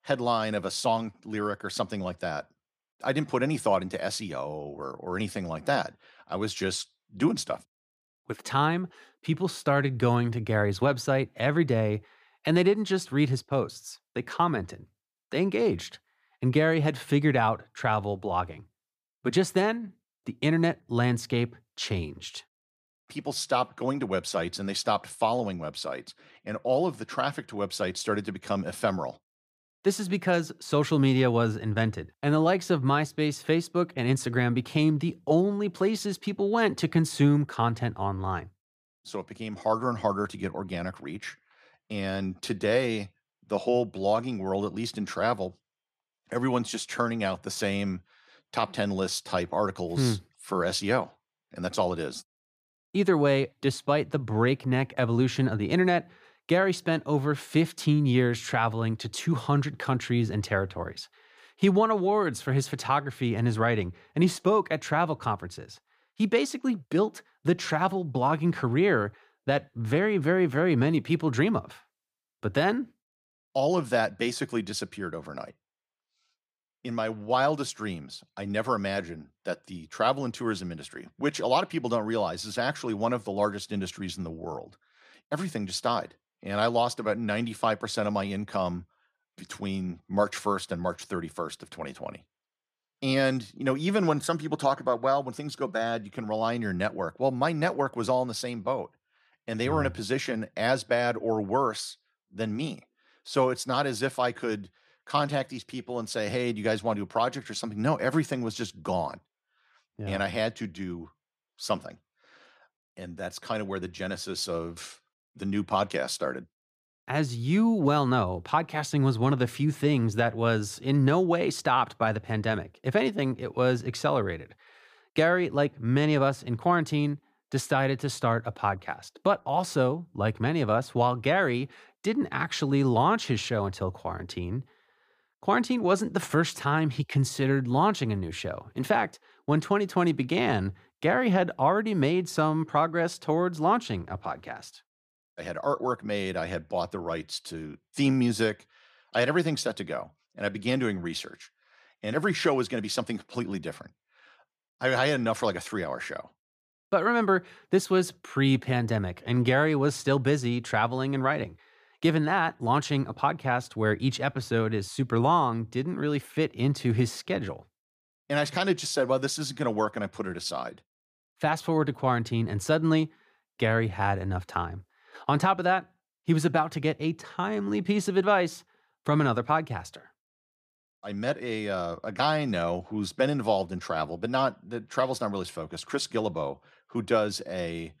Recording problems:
none

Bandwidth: 15 kHz